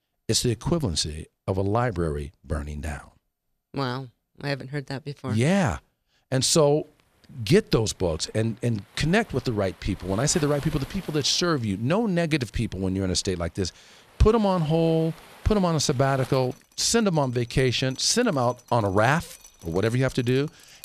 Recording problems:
rain or running water; faint; from 7 s on; 20 dB below the speech

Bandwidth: 14 kHz